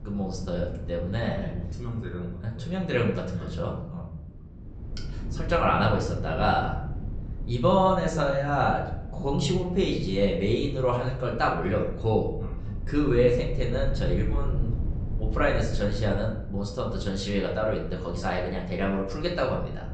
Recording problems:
off-mic speech; far
high frequencies cut off; noticeable; nothing above 8 kHz
room echo; slight; dies away in 0.6 s
wind noise on the microphone; occasional gusts; 25 dB below the speech
low rumble; faint; from 5 s on; 25 dB below the speech

